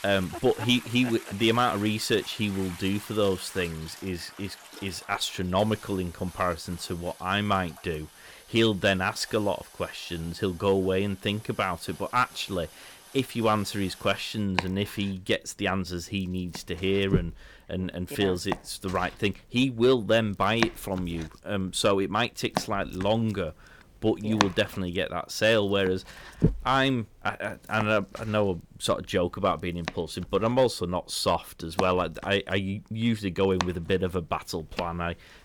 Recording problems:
household noises; noticeable; throughout; 10 dB below the speech

